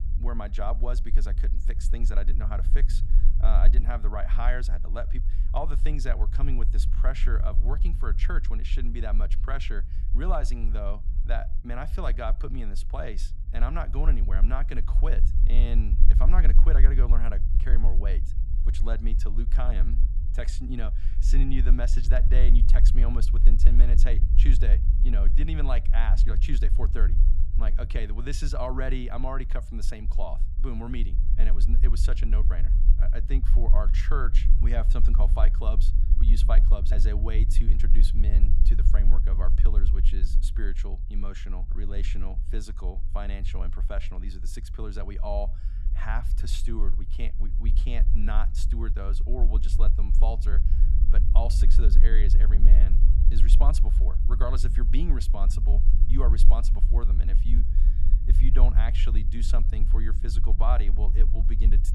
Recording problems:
low rumble; loud; throughout; 10 dB below the speech

